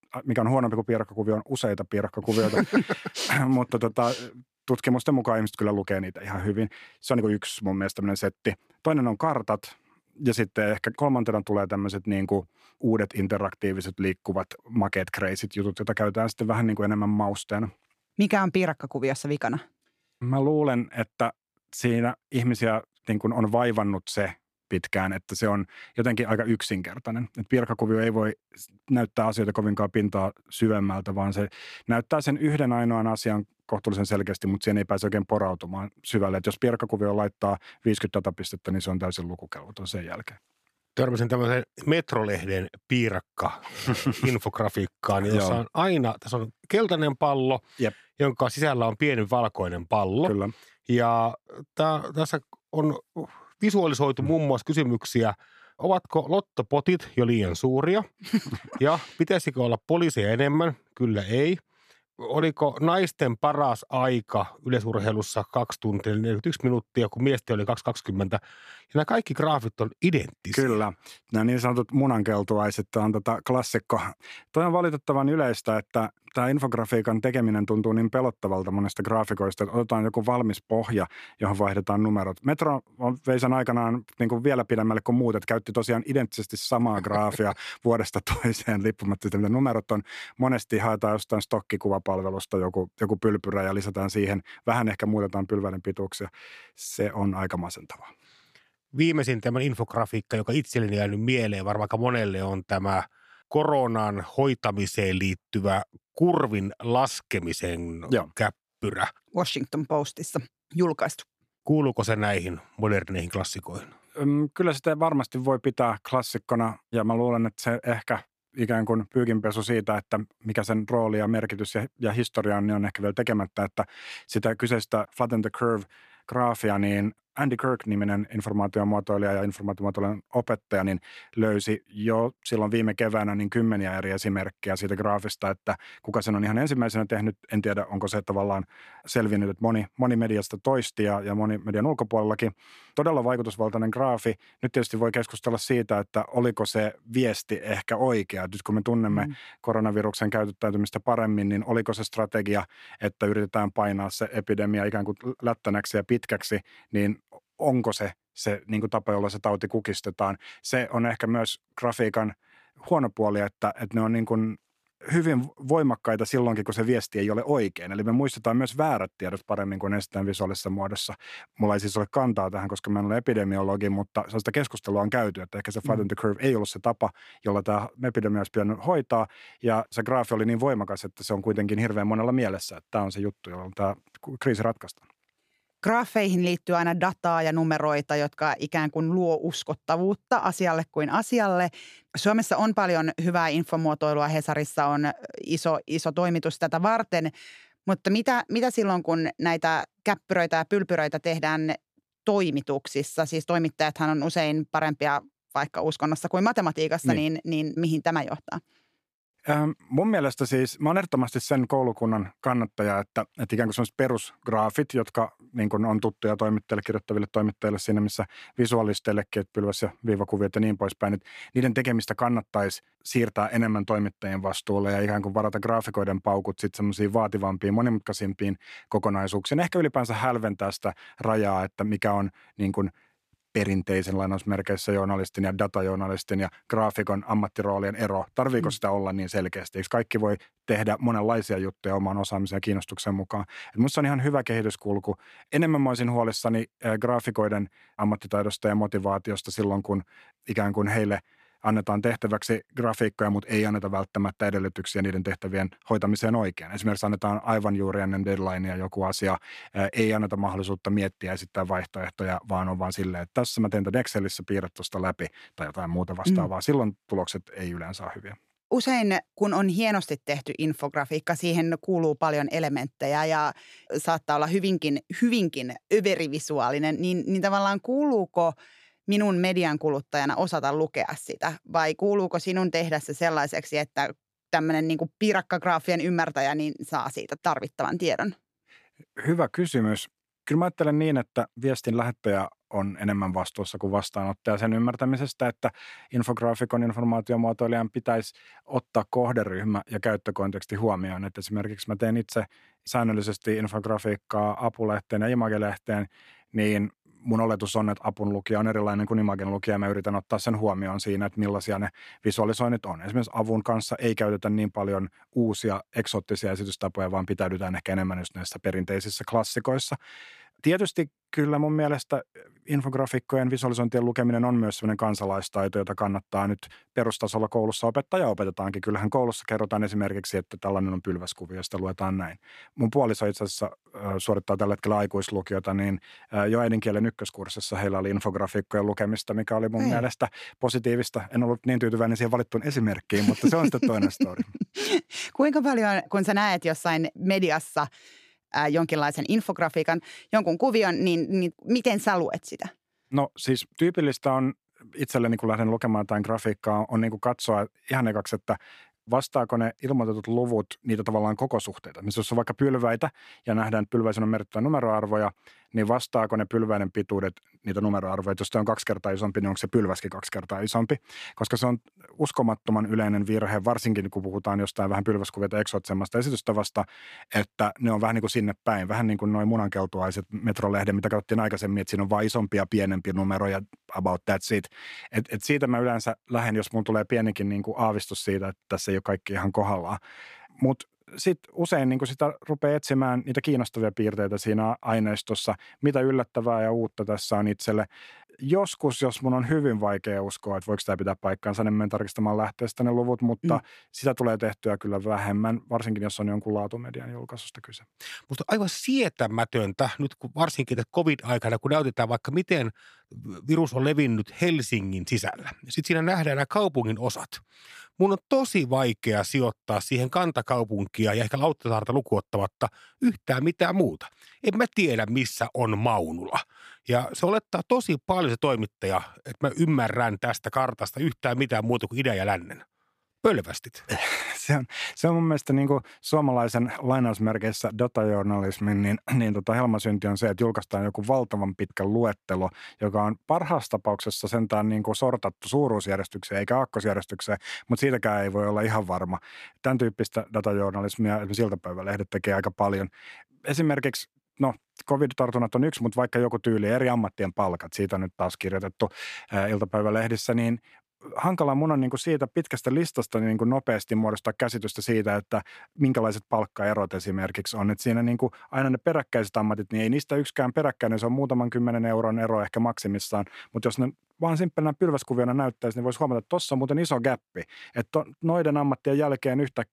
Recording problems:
none

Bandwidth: 14.5 kHz